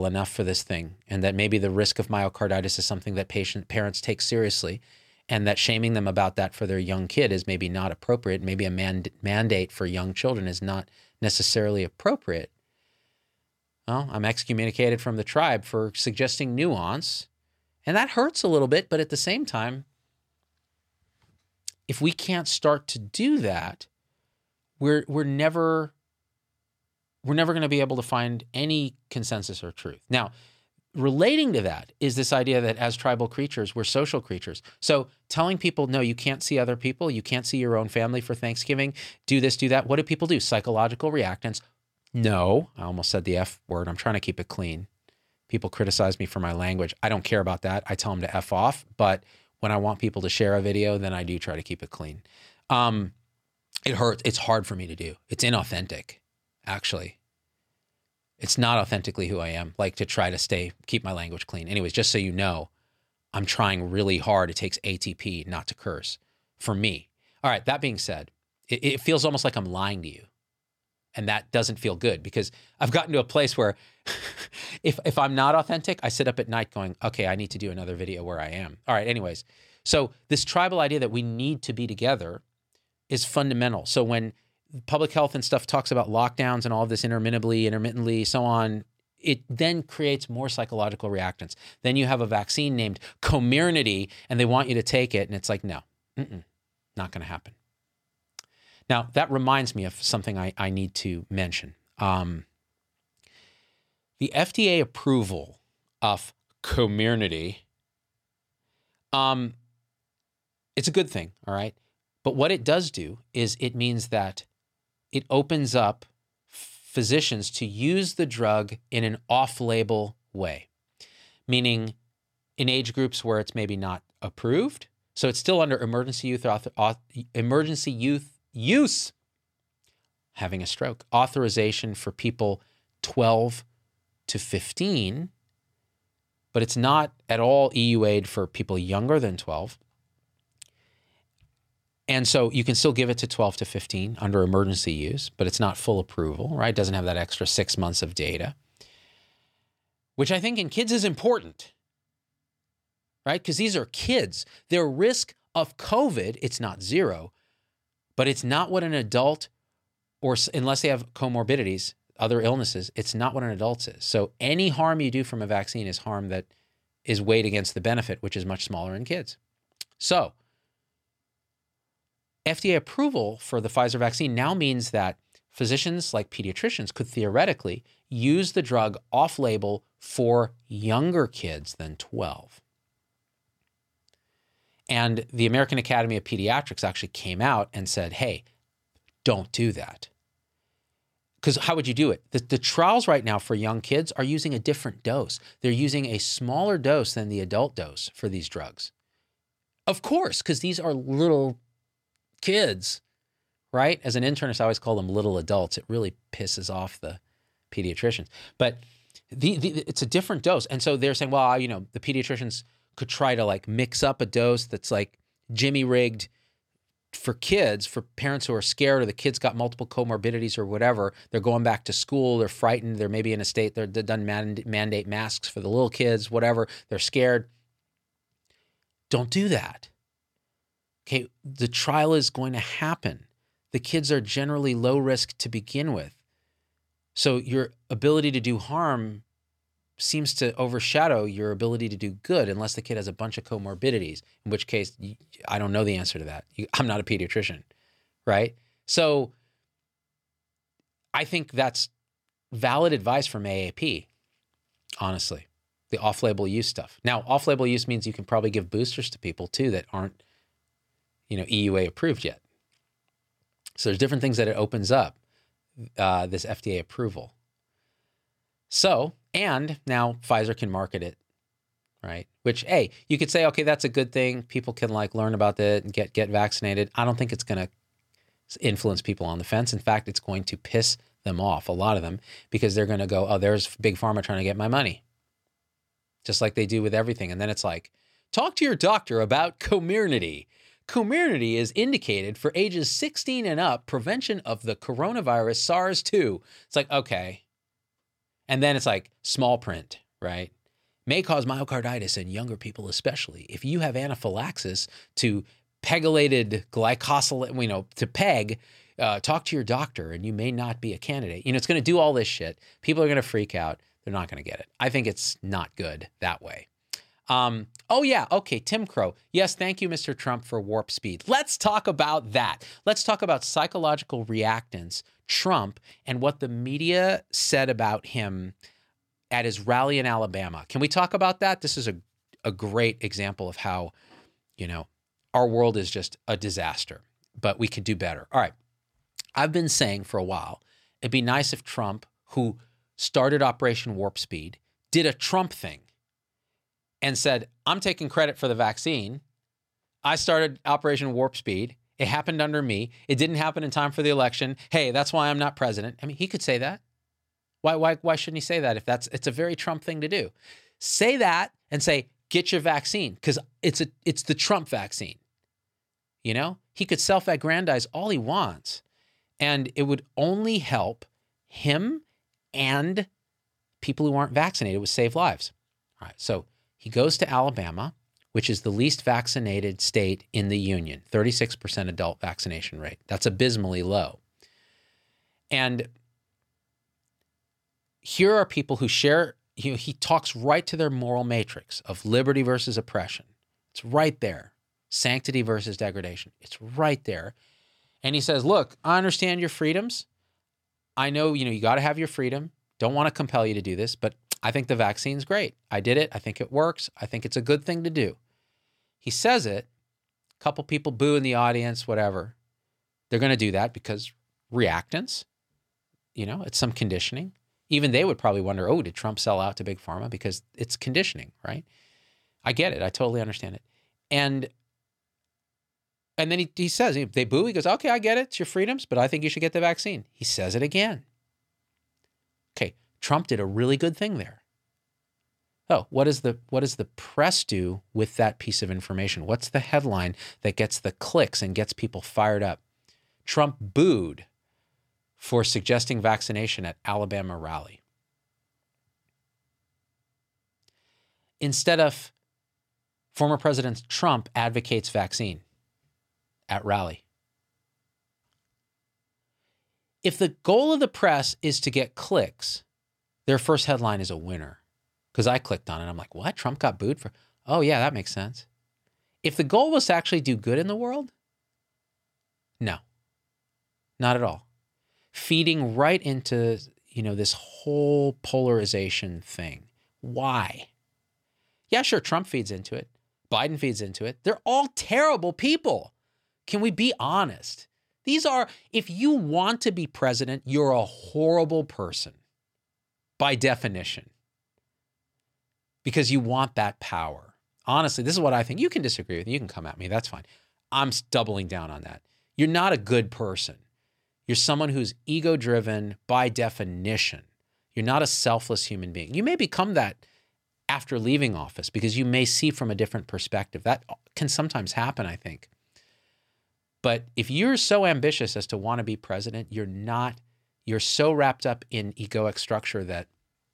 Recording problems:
abrupt cut into speech; at the start

